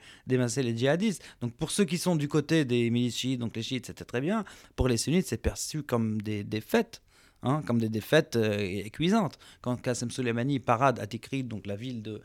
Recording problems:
none

